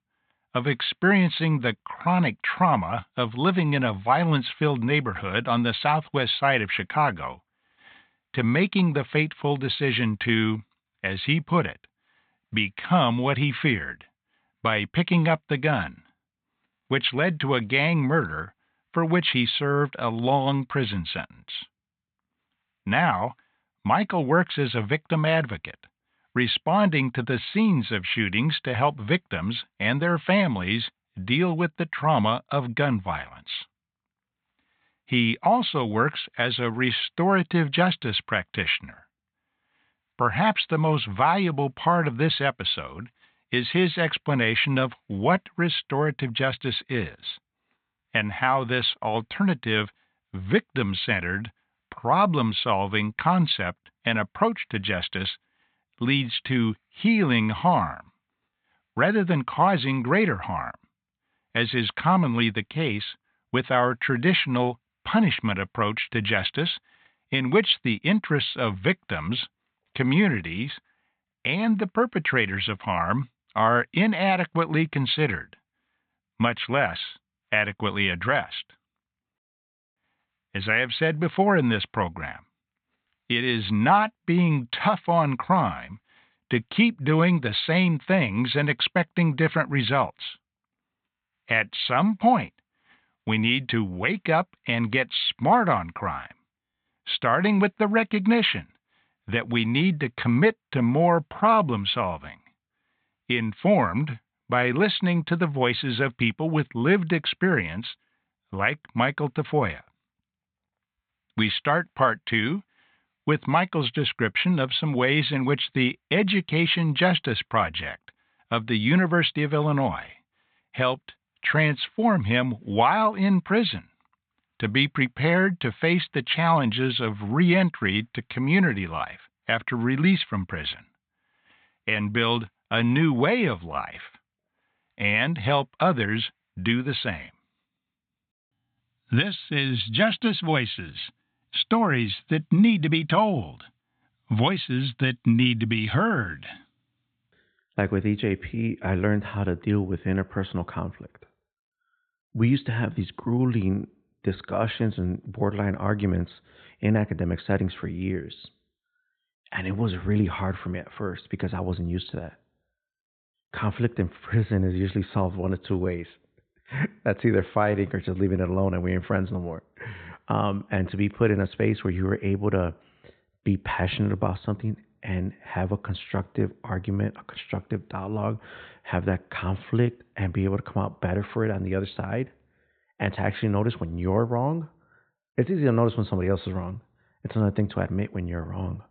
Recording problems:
high frequencies cut off; severe; nothing above 4 kHz

